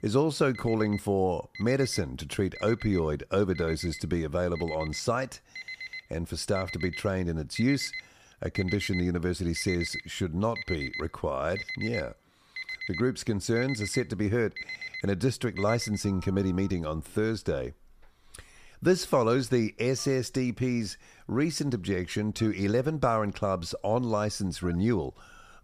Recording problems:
alarms or sirens; noticeable; throughout; 10 dB below the speech

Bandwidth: 15 kHz